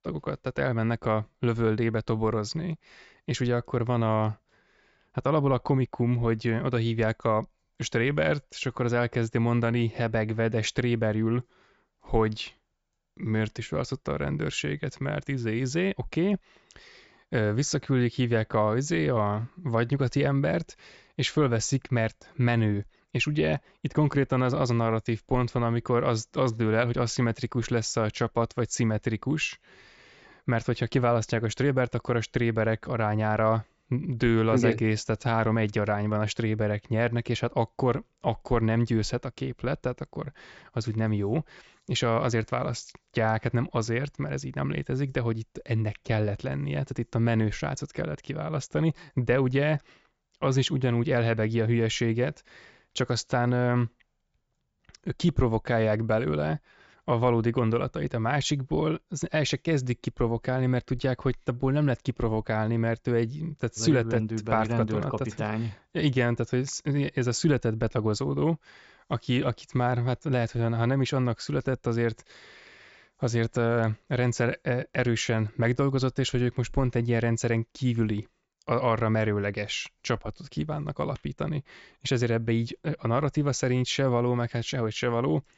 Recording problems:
high frequencies cut off; noticeable; nothing above 8 kHz

